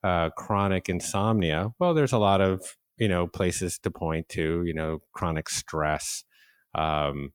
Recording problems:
none

